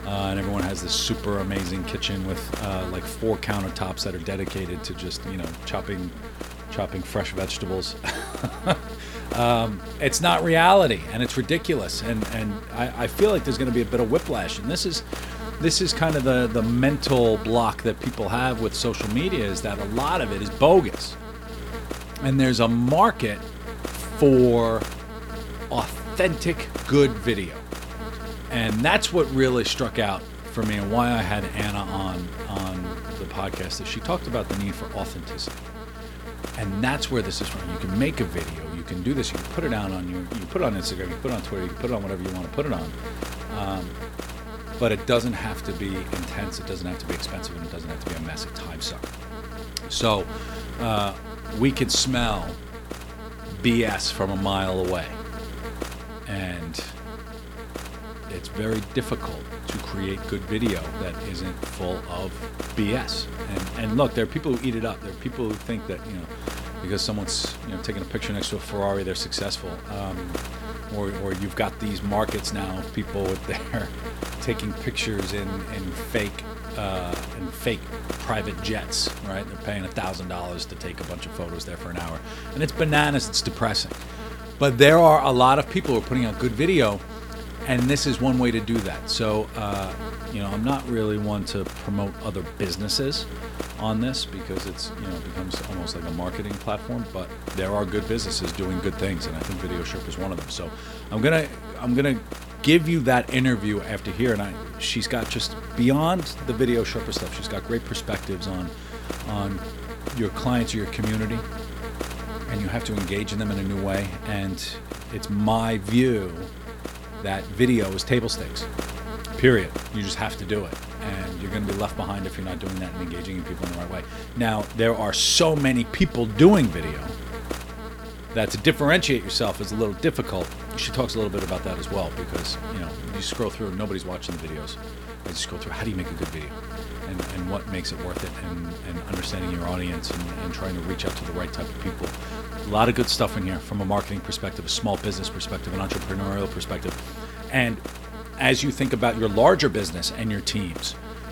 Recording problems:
electrical hum; noticeable; throughout; 60 Hz, 10 dB below the speech

